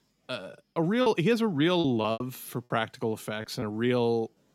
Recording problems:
choppy; very; at 0.5 s and at 2 s; 10% of the speech affected

